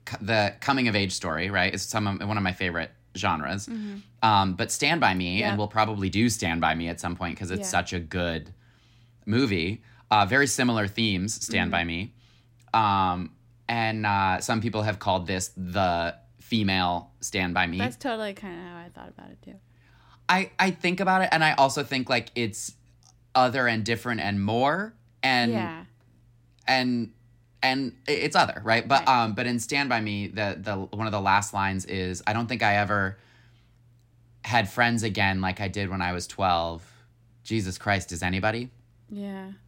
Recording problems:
none

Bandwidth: 16 kHz